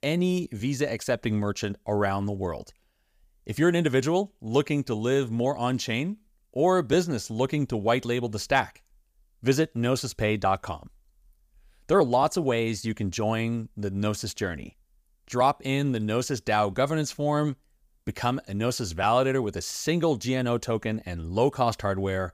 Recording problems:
none

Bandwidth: 15 kHz